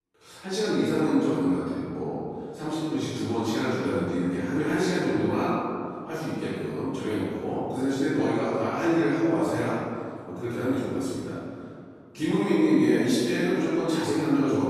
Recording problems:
room echo; strong; dies away in 2.2 s
off-mic speech; far

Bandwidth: 13.5 kHz